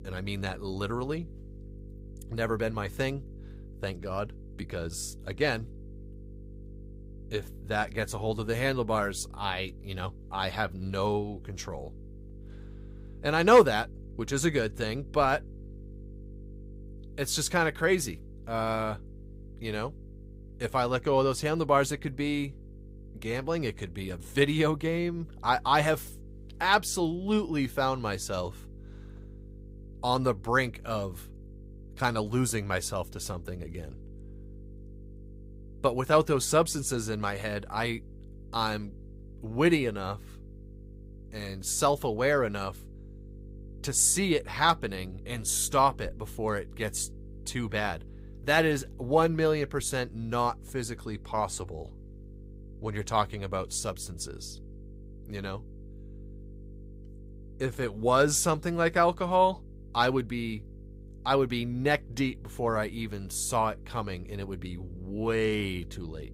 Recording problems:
electrical hum; faint; throughout; 50 Hz, 30 dB below the speech

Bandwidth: 15.5 kHz